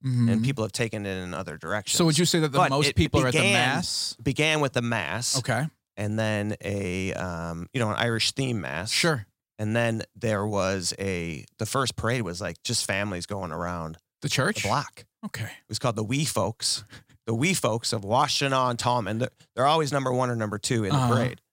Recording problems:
none

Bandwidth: 16 kHz